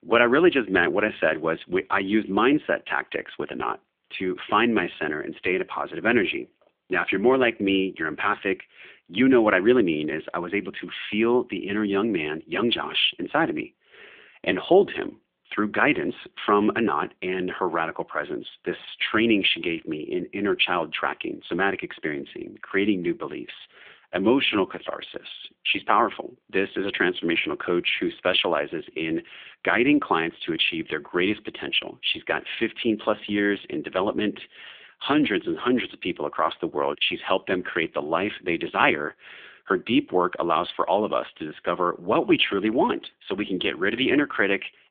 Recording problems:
phone-call audio; nothing above 3.5 kHz

